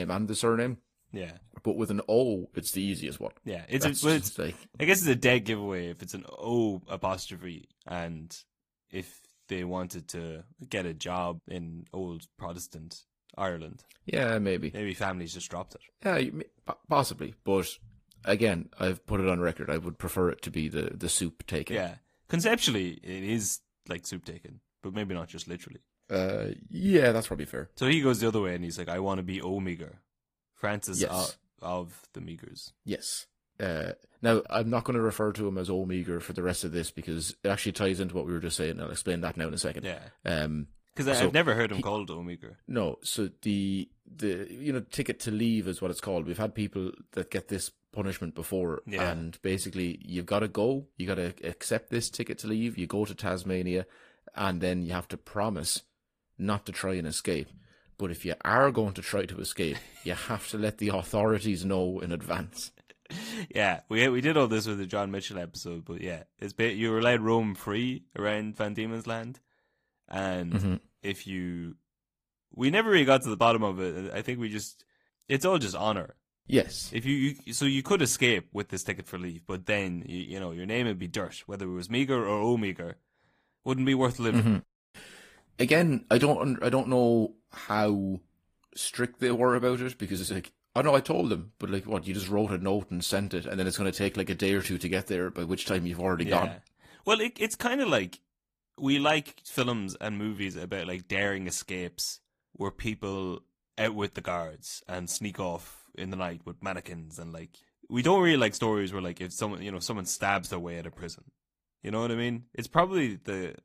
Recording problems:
garbled, watery; slightly; nothing above 15 kHz
abrupt cut into speech; at the start

